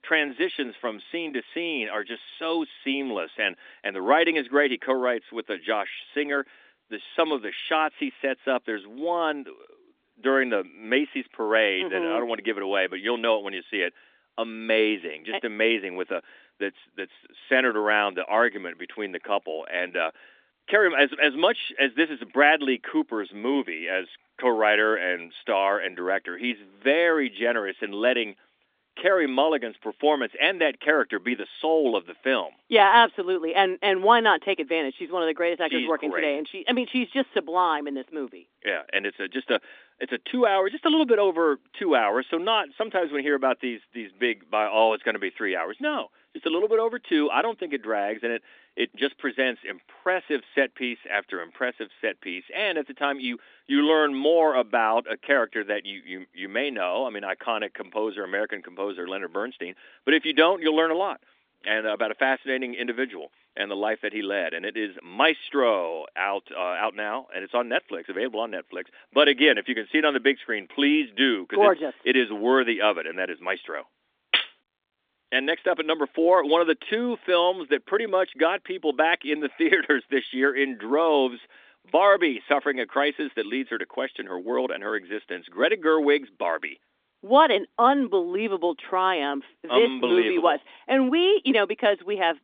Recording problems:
phone-call audio; nothing above 3.5 kHz

